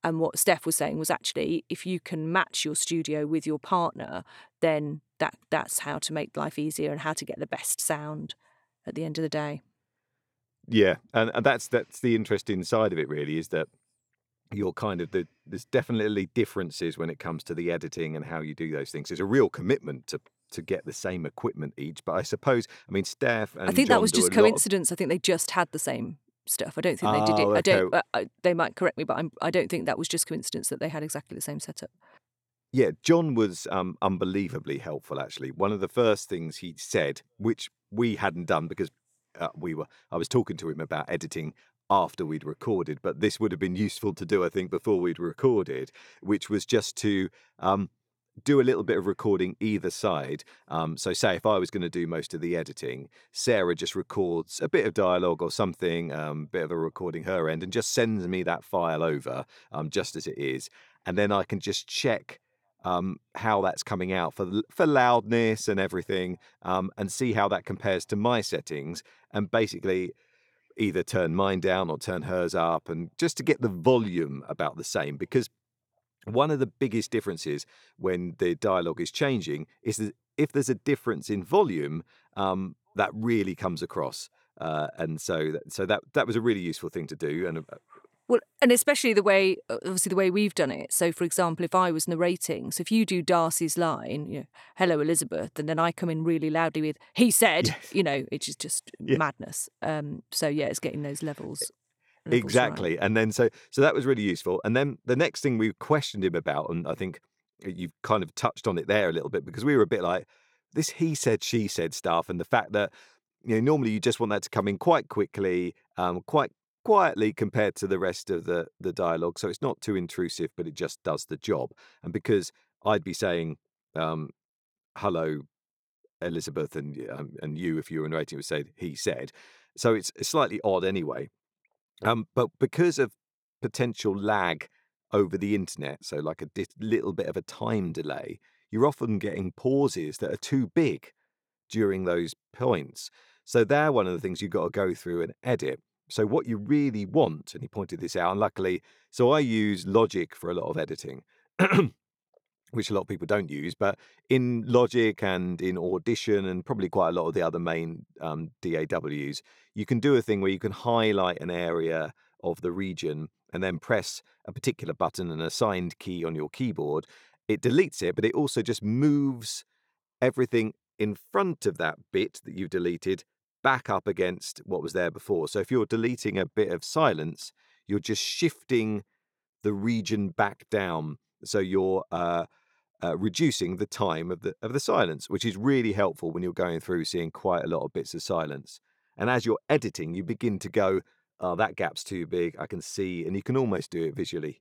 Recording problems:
none

